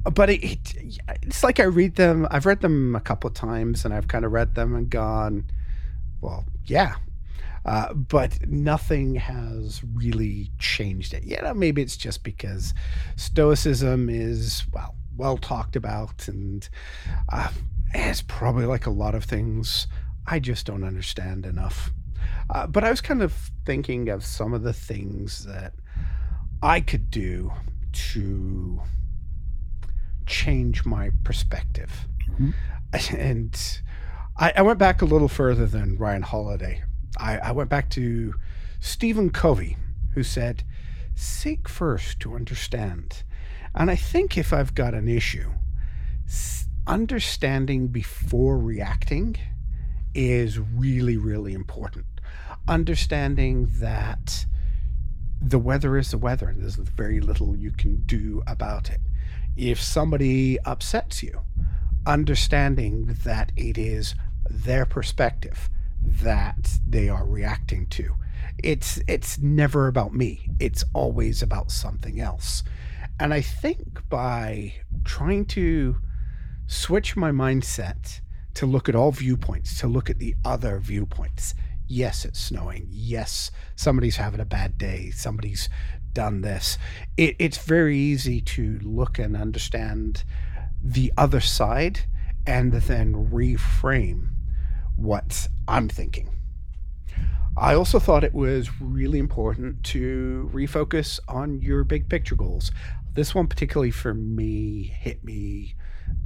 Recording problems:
low rumble; faint; throughout; 25 dB below the speech

